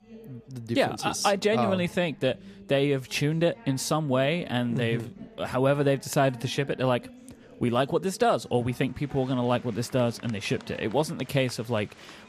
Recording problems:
chatter from many people; faint; throughout; 20 dB below the speech

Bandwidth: 14.5 kHz